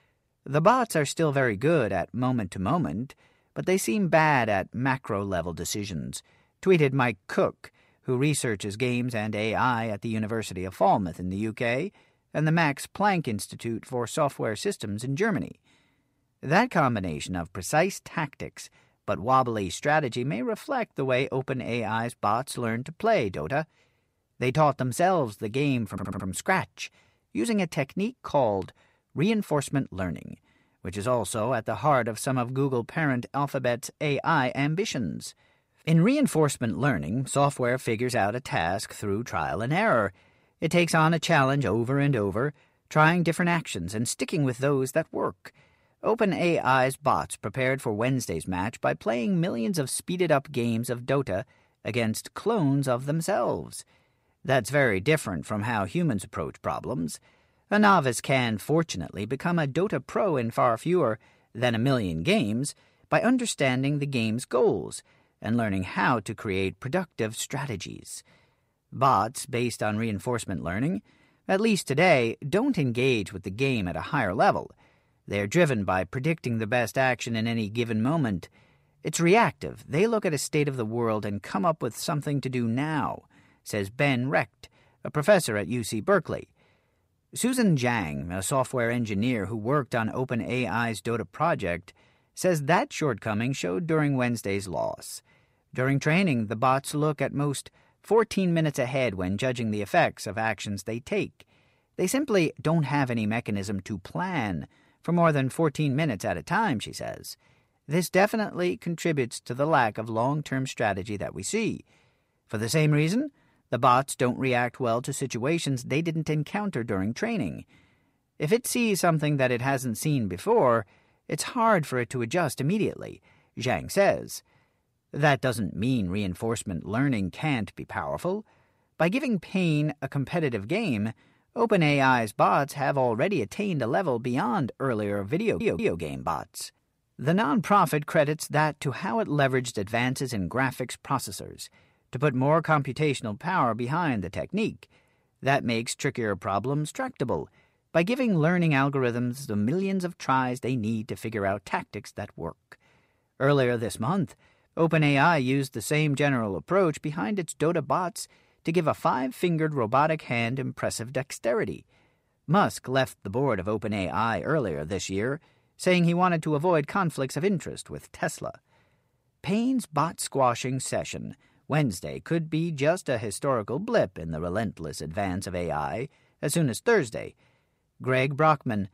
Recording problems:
audio stuttering; at 26 s and at 2:15

